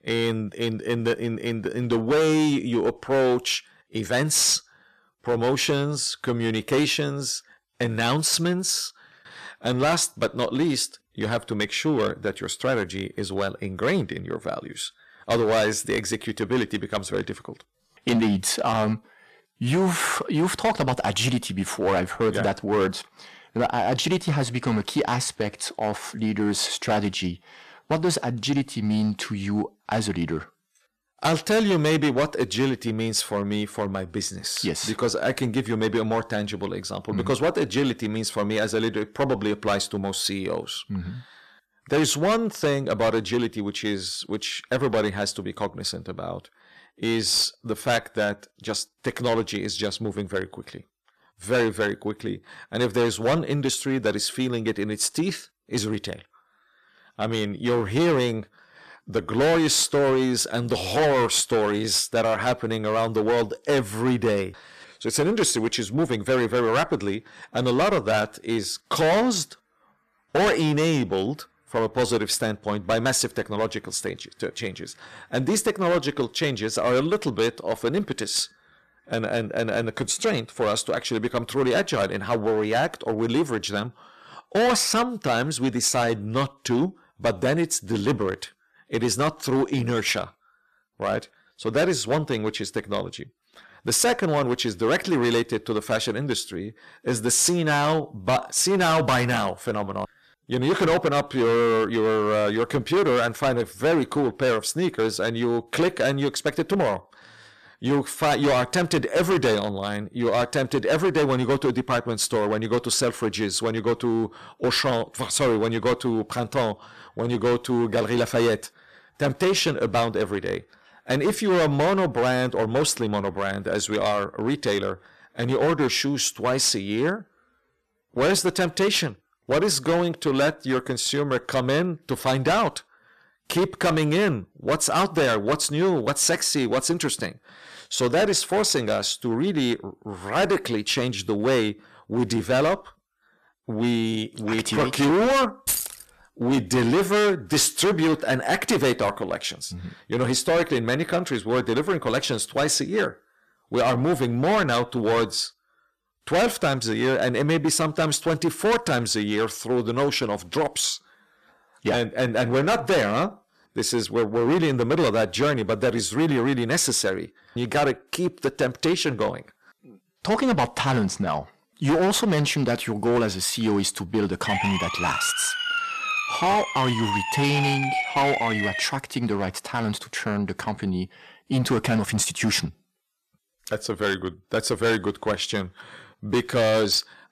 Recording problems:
distortion; heavy; 10% of the sound clipped
jangling keys; noticeable; at 2:26; peak level with the speech
siren; noticeable; from 2:54 to 2:59; peak level with the speech

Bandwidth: 14 kHz